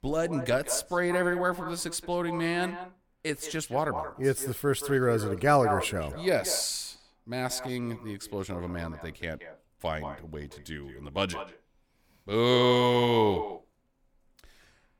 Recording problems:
echo of what is said; strong; throughout; 170 ms later, 10 dB below the speech

